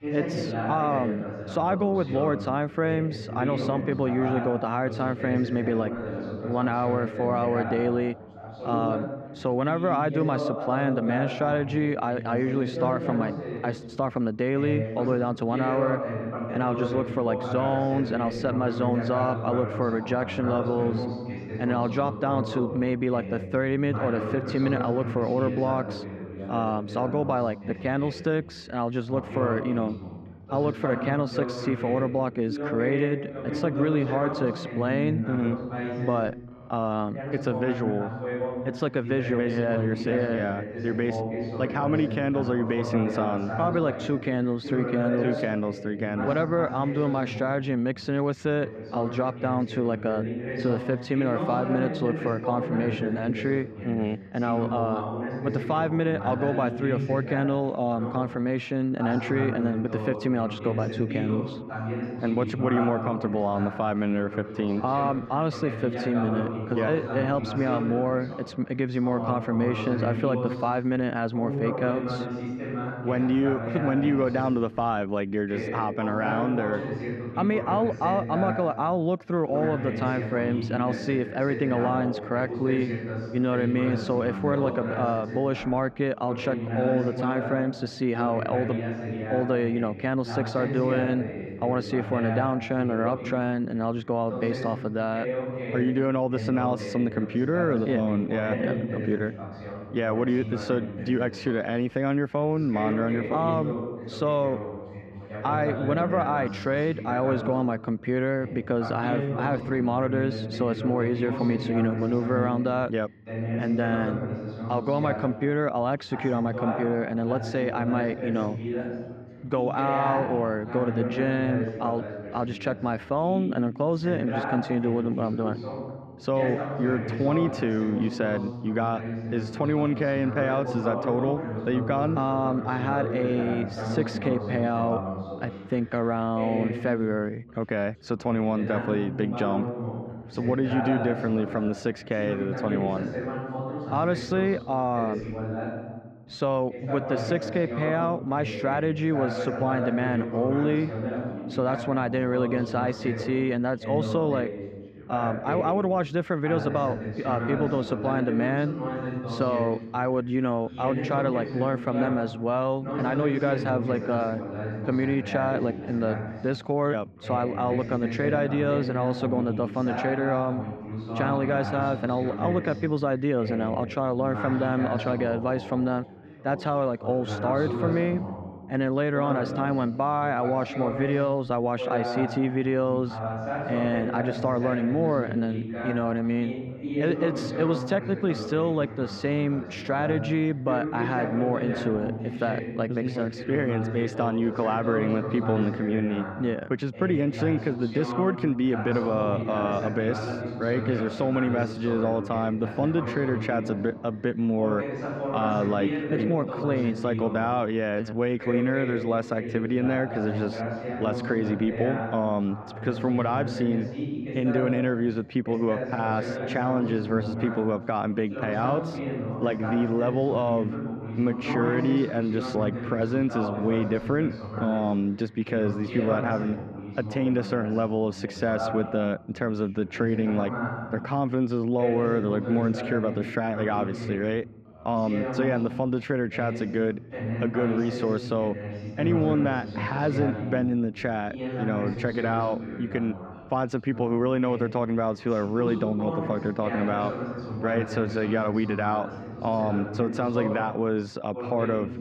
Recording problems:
muffled; slightly; fading above 4 kHz
background chatter; loud; throughout; 2 voices, 6 dB below the speech

